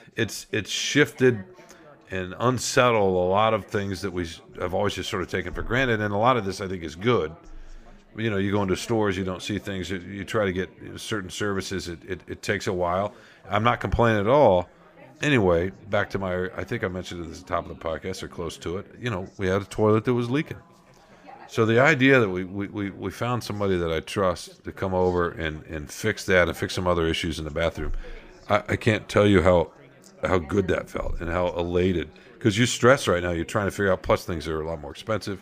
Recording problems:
background chatter; faint; throughout; 4 voices, 25 dB below the speech

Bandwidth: 15 kHz